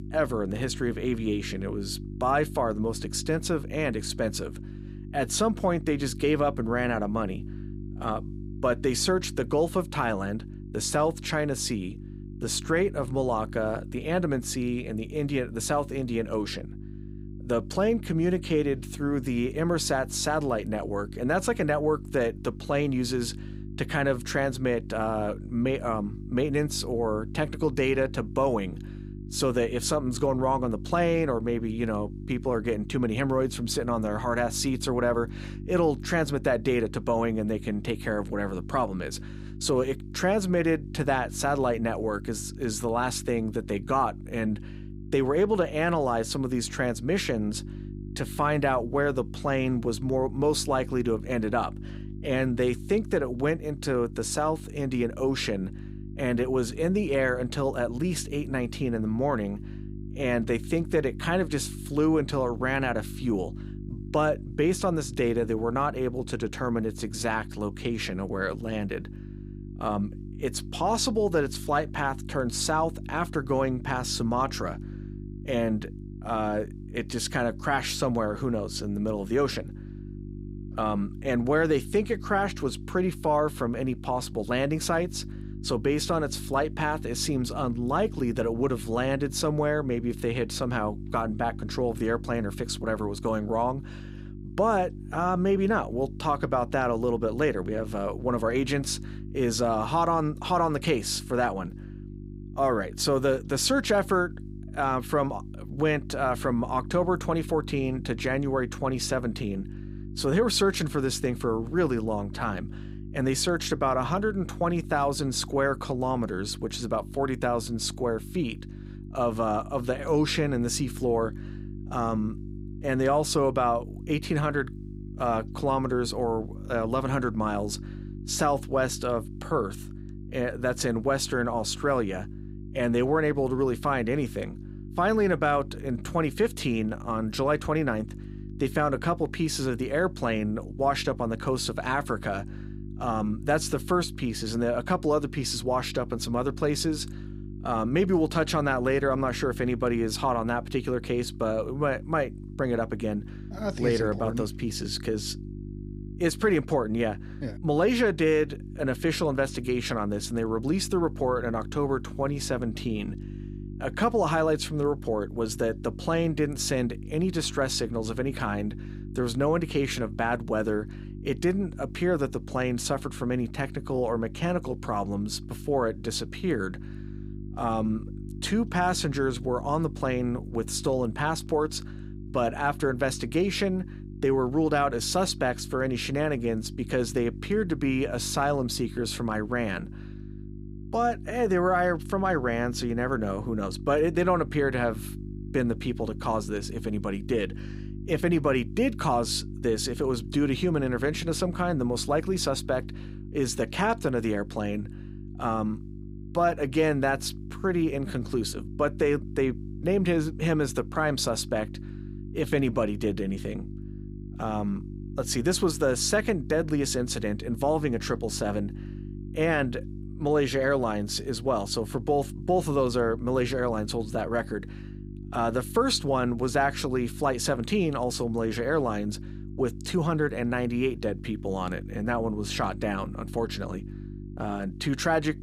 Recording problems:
electrical hum; noticeable; throughout; 50 Hz, 20 dB below the speech

